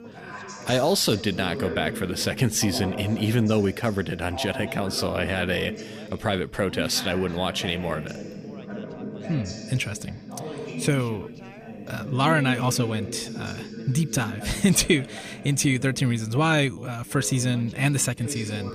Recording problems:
background chatter; noticeable; throughout; 2 voices, 10 dB below the speech

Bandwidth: 15 kHz